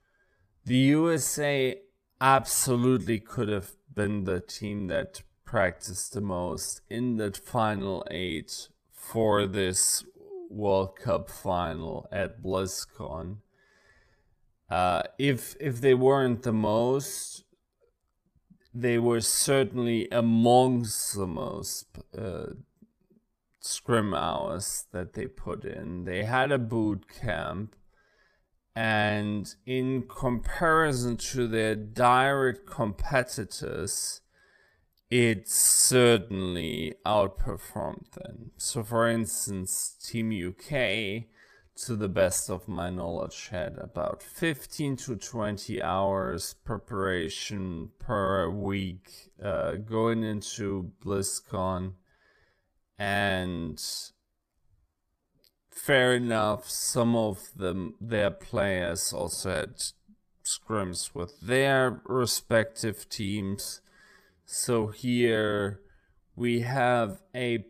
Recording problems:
wrong speed, natural pitch; too slow; 0.6 times normal speed

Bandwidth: 14.5 kHz